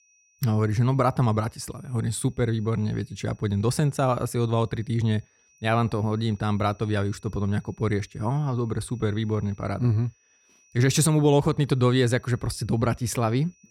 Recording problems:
high-pitched whine; faint; throughout; 6 kHz, 35 dB below the speech

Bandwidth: 18.5 kHz